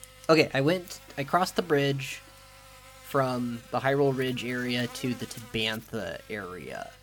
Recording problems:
electrical hum; noticeable; throughout; 50 Hz, 20 dB below the speech

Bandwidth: 17.5 kHz